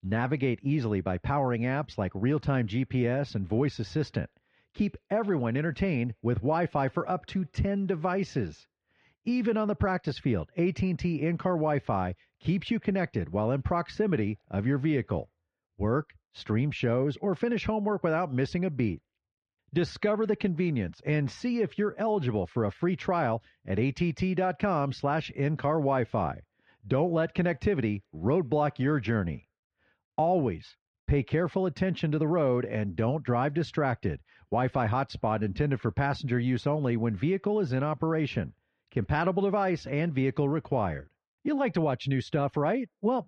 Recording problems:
muffled; slightly; fading above 3 kHz

